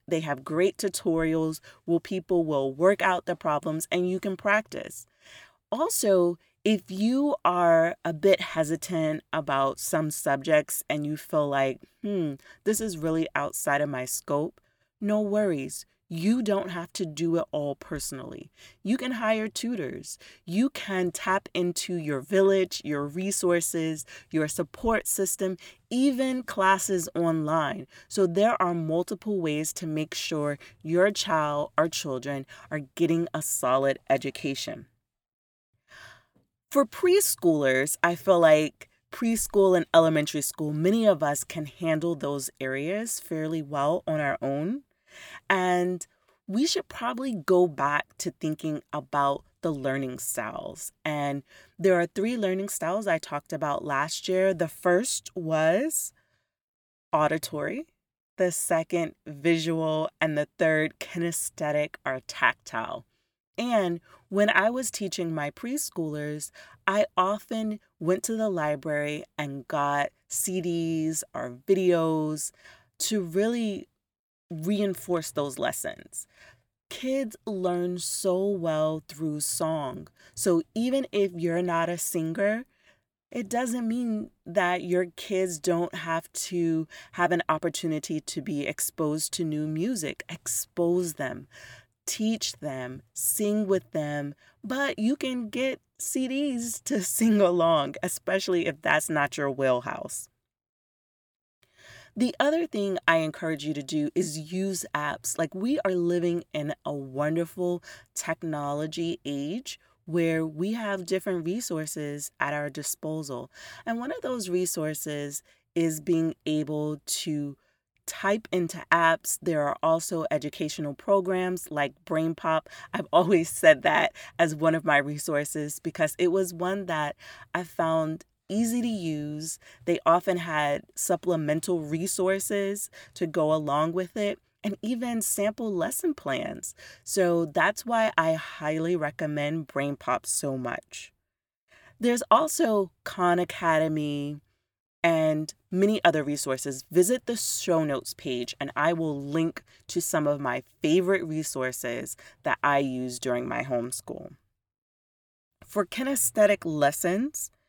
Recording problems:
none

